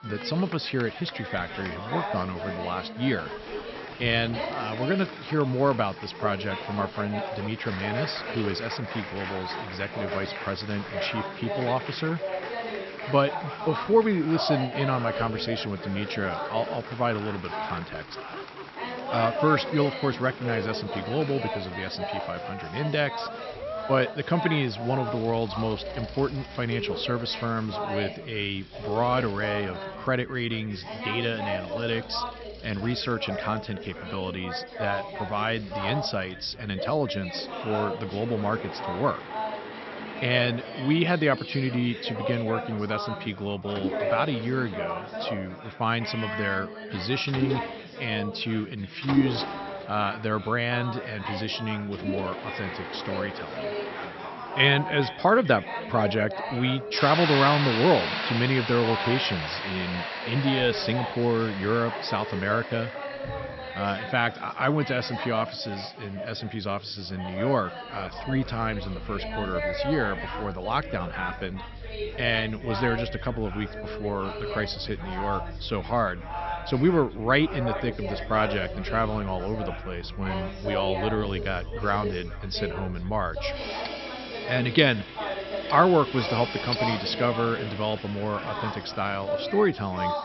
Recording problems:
high frequencies cut off; noticeable; nothing above 5.5 kHz
echo of what is said; faint; from 29 s on; 430 ms later, 20 dB below the speech
machinery noise; loud; throughout; 10 dB below the speech
chatter from many people; loud; throughout; 7 dB below the speech

